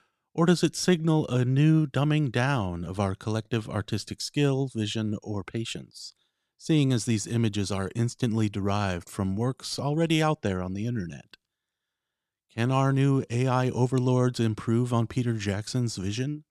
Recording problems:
none

